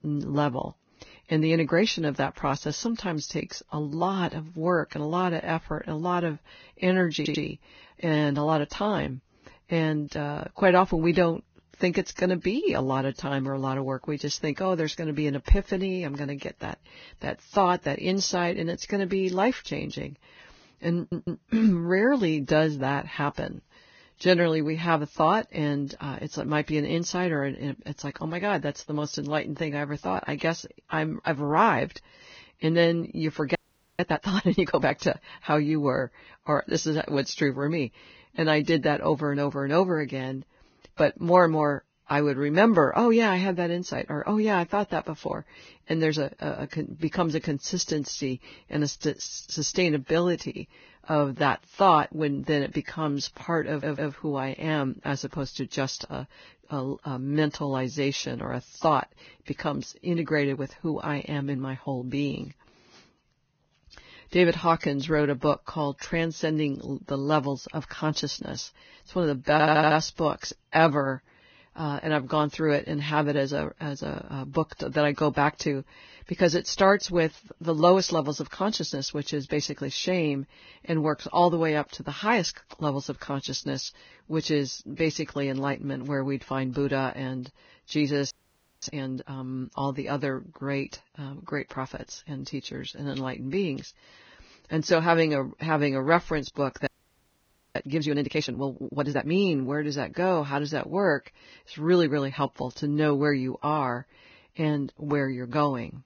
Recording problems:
garbled, watery; badly; nothing above 6.5 kHz
audio stuttering; 4 times, first at 7 s
audio freezing; at 34 s, at 1:28 for 0.5 s and at 1:37 for 1 s

